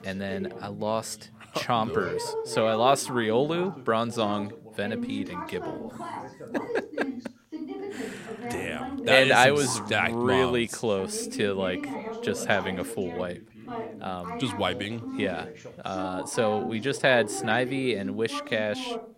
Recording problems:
background chatter; loud; throughout; 2 voices, 10 dB below the speech

